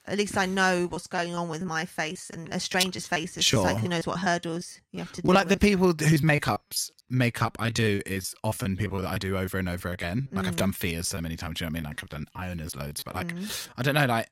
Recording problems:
choppy; very; 15% of the speech affected

